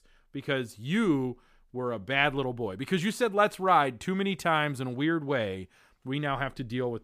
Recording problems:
none

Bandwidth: 15 kHz